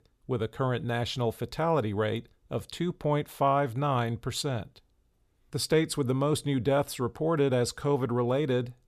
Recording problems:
none

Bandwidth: 14.5 kHz